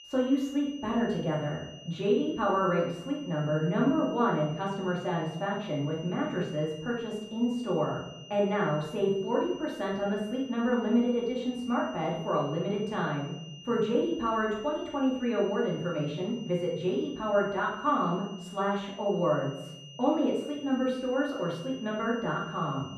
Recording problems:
off-mic speech; far
muffled; very; fading above 4 kHz
room echo; noticeable; dies away in 0.7 s
high-pitched whine; noticeable; throughout; 3 kHz, 20 dB below the speech

